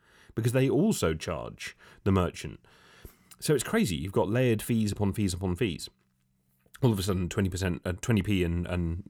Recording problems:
none

